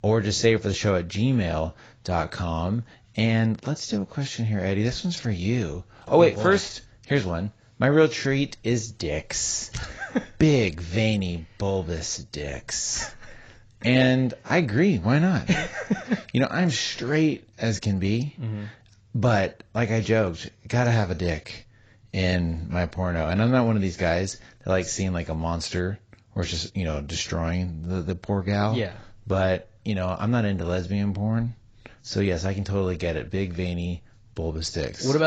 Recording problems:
garbled, watery; badly; nothing above 7.5 kHz
abrupt cut into speech; at the end

